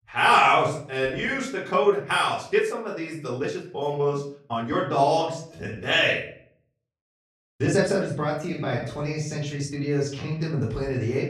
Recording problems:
off-mic speech; far
room echo; slight; dies away in 0.5 s
uneven, jittery; strongly; from 1 to 10 s

